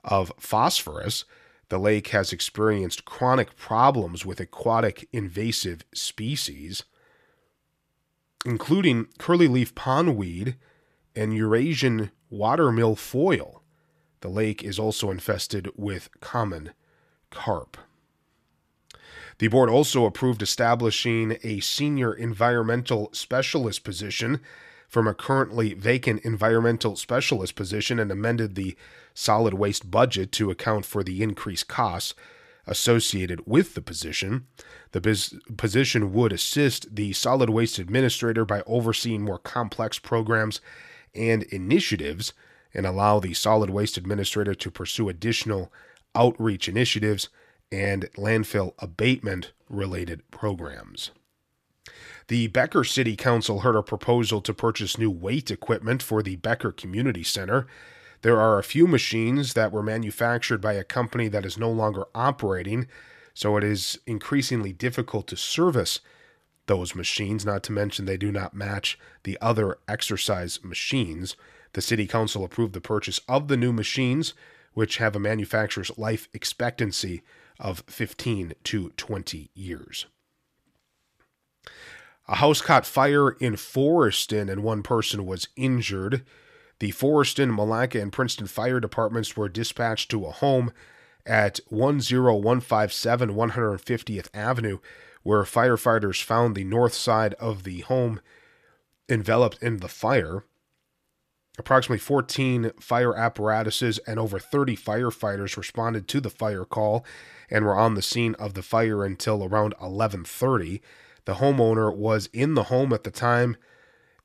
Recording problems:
none

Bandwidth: 14.5 kHz